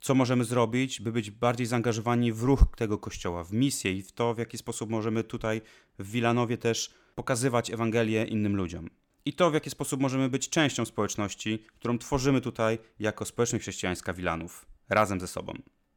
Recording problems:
none

